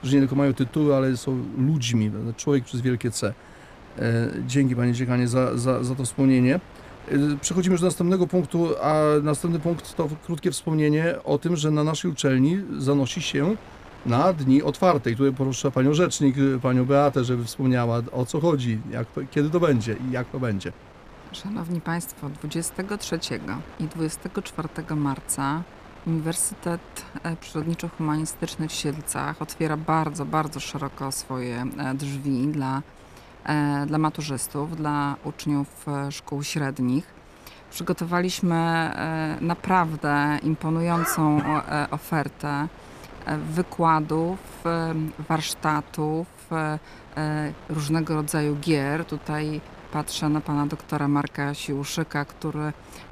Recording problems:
wind noise on the microphone; occasional gusts; 20 dB below the speech

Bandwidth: 14.5 kHz